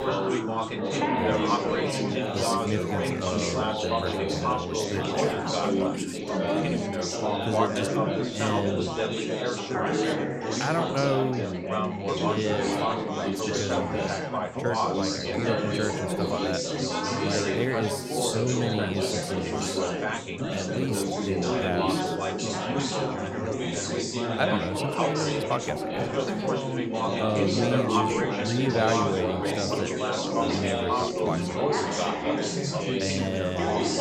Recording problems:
chatter from many people; very loud; throughout; 5 dB above the speech

